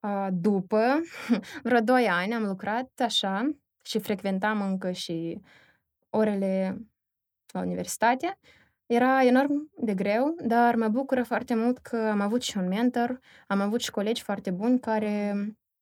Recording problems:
none

